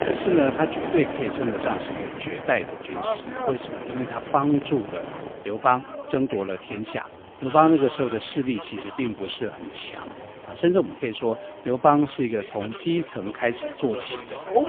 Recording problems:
phone-call audio; poor line
traffic noise; loud; throughout; 9 dB below the speech

